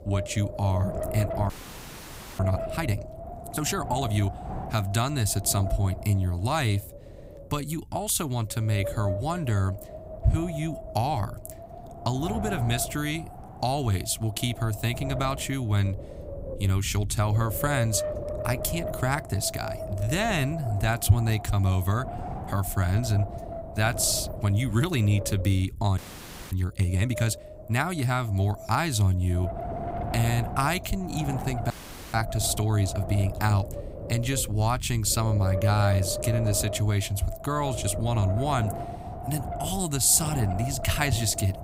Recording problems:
wind noise on the microphone; heavy; 6 dB below the speech
audio freezing; at 1.5 s for 1 s, at 26 s for 0.5 s and at 32 s

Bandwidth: 15.5 kHz